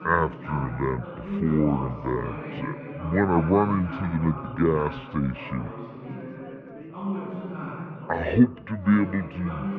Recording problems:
muffled; very; fading above 2.5 kHz
wrong speed and pitch; too slow and too low; 0.6 times normal speed
background chatter; noticeable; throughout; 4 voices, 10 dB below the speech

